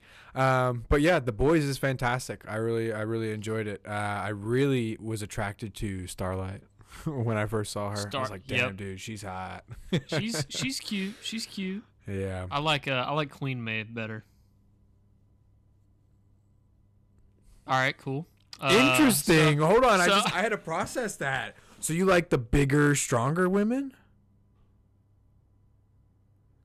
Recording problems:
distortion; slight; 2% of the sound clipped

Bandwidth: 13.5 kHz